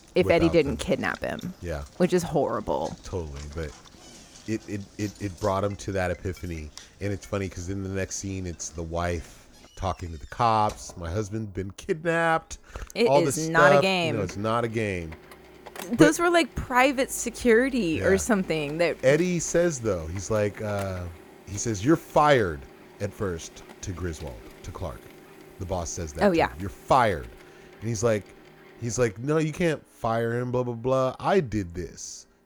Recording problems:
household noises; faint; throughout; 20 dB below the speech

